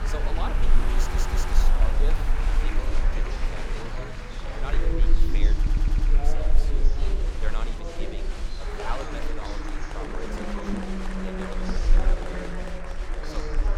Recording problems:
traffic noise; very loud; throughout; 4 dB above the speech
chatter from many people; very loud; throughout; 4 dB above the speech
low rumble; noticeable; throughout; 15 dB below the speech
audio stuttering; at 1 s and at 5.5 s

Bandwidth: 17.5 kHz